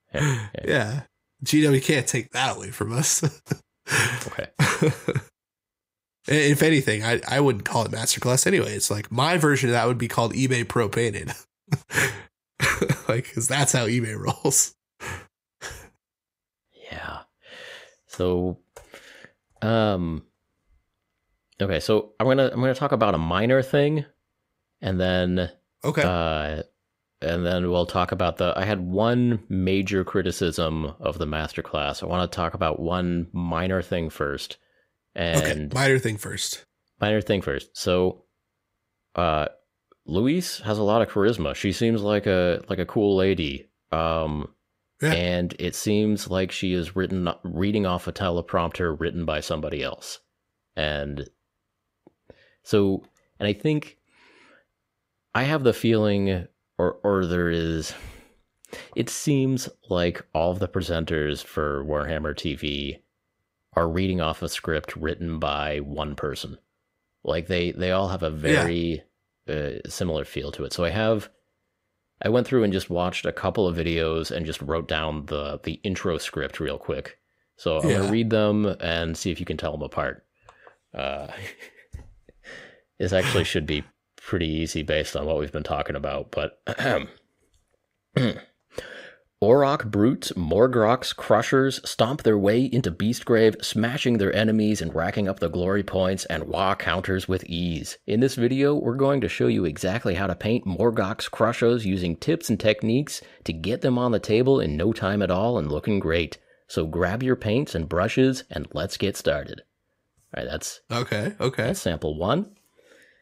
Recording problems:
none

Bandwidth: 15.5 kHz